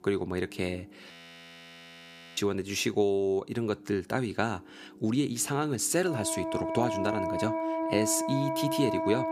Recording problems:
background music; loud; throughout; 2 dB below the speech
audio freezing; at 1 s for 1.5 s

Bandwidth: 15 kHz